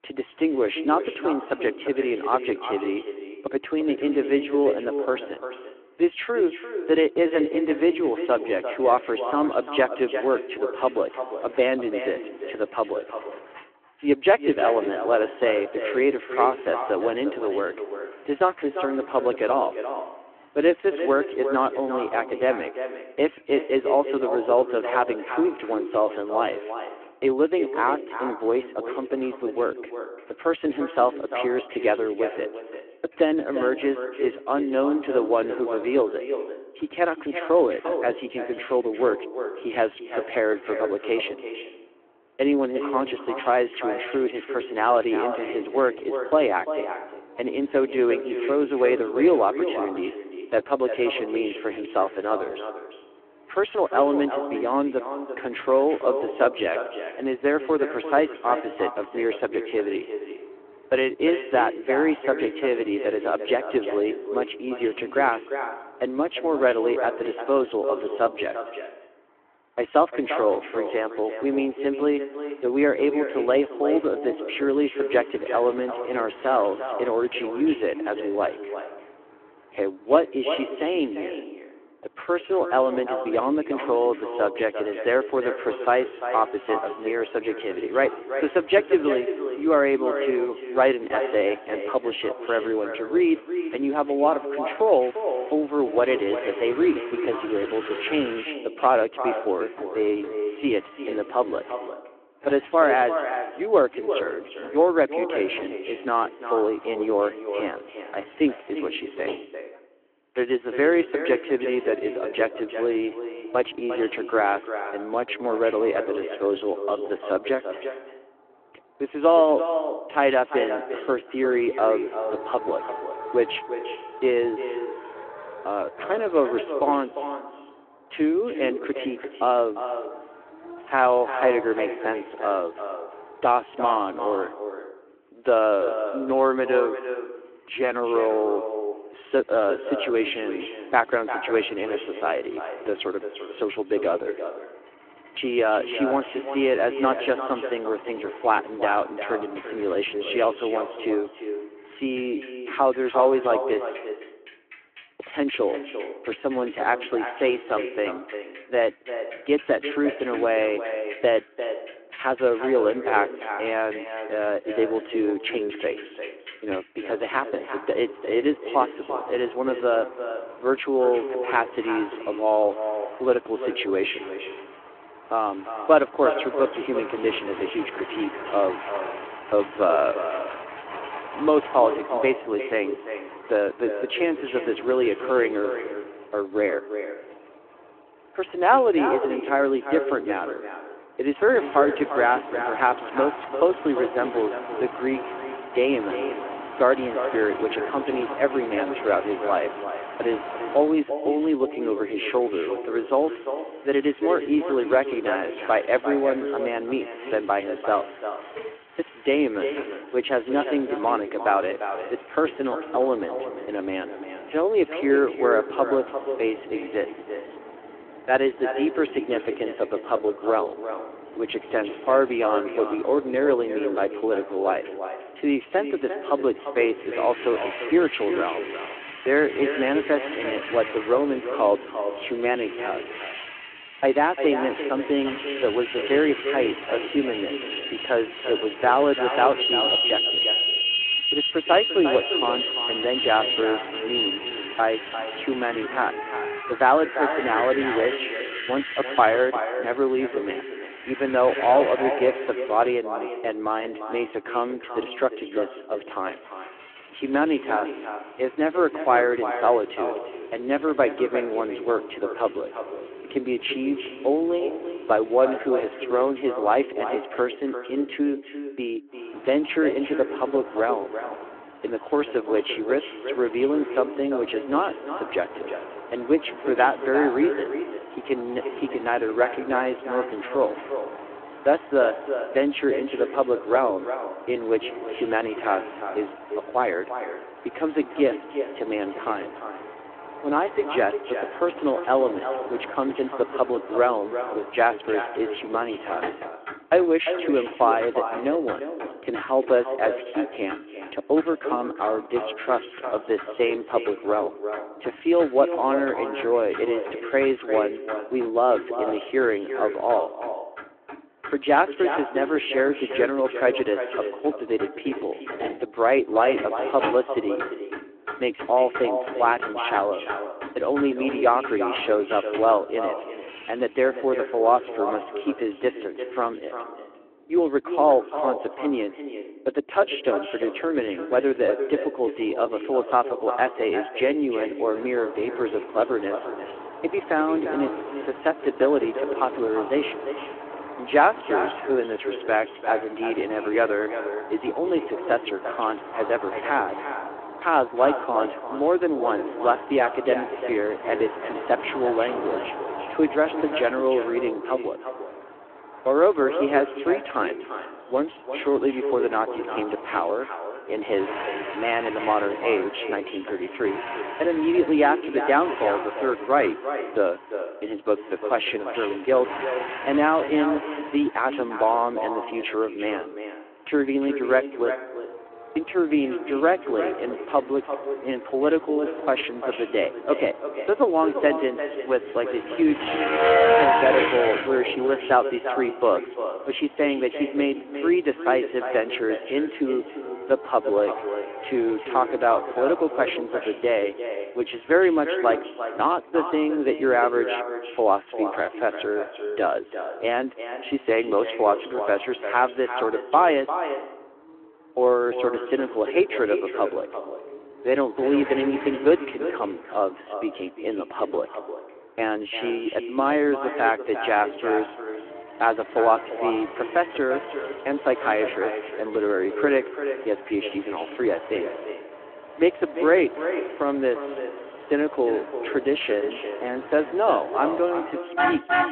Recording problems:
echo of what is said; strong; throughout; 350 ms later, 8 dB below the speech
phone-call audio
traffic noise; loud; throughout; 10 dB below the speech

